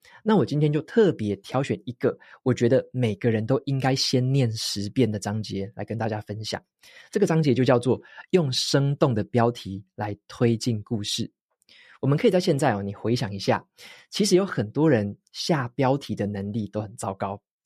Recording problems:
none

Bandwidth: 14.5 kHz